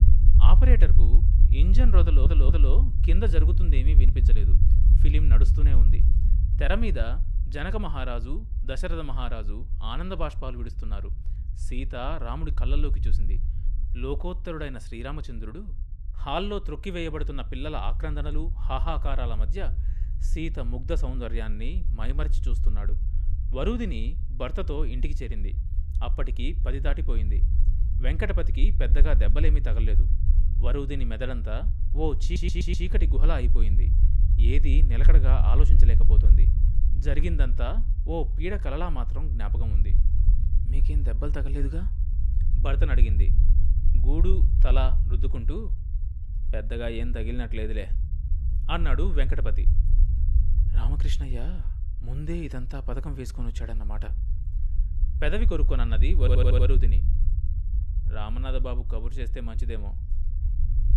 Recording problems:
low rumble; noticeable; throughout; 10 dB below the speech
audio stuttering; at 2 s, at 32 s and at 56 s

